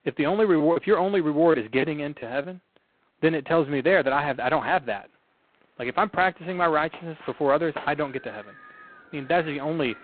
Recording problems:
phone-call audio; poor line; nothing above 4 kHz
wind in the background; faint; throughout; 20 dB below the speech
choppy; very; from 0.5 to 2.5 s; 8% of the speech affected

